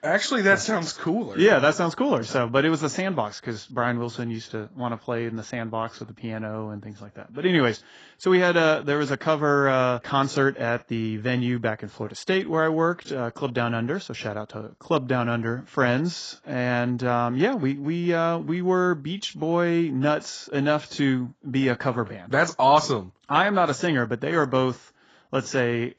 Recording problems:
garbled, watery; badly; nothing above 7.5 kHz

